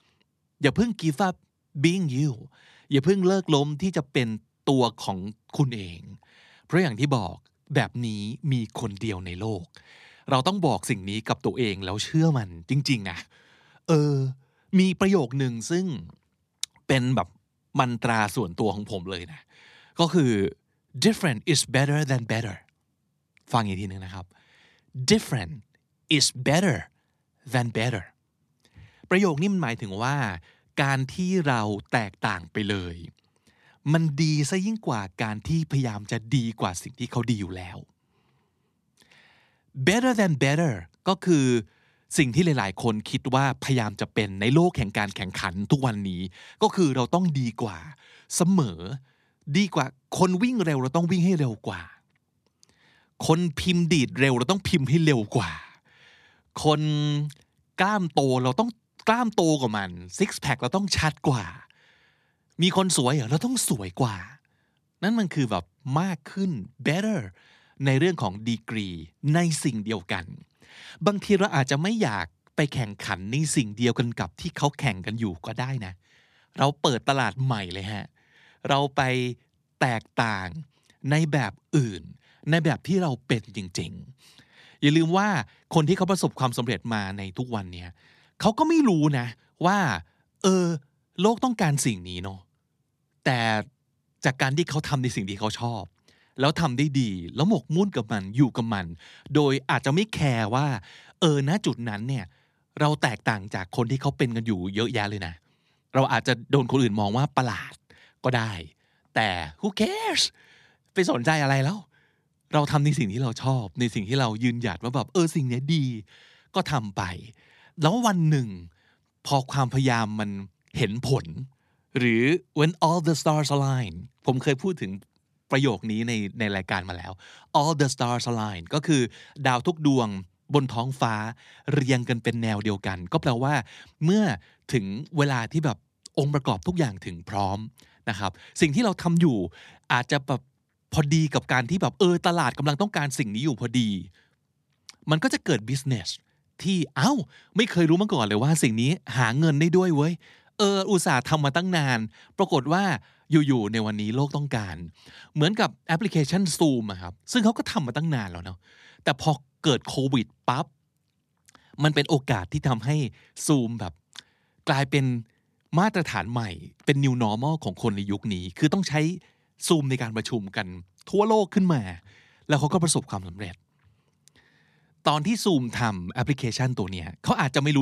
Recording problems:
abrupt cut into speech; at the end

